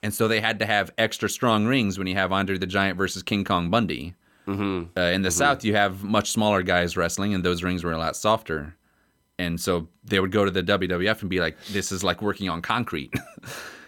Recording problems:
none

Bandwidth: 18 kHz